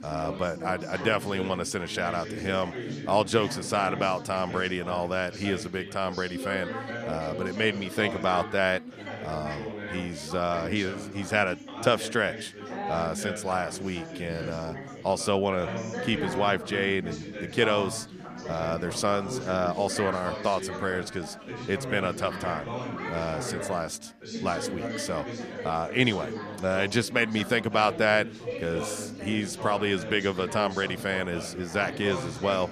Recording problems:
background chatter; loud; throughout; 4 voices, 8 dB below the speech

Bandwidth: 14.5 kHz